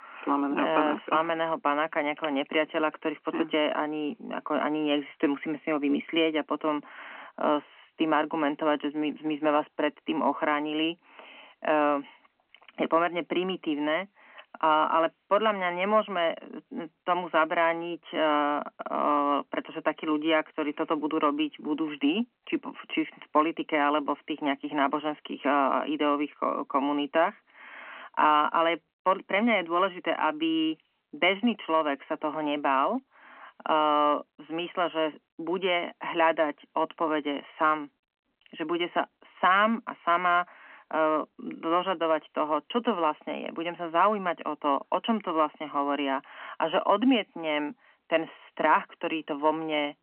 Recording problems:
phone-call audio; nothing above 3 kHz

